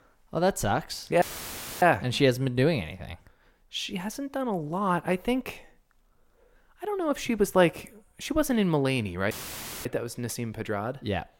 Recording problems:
audio cutting out; filled with static; at 1 s for 0.5 s and at 9.5 s for 0.5 s

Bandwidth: 16.5 kHz